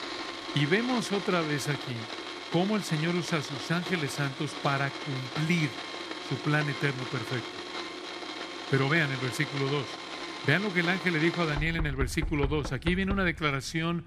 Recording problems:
household noises; loud; throughout; 7 dB below the speech

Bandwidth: 14.5 kHz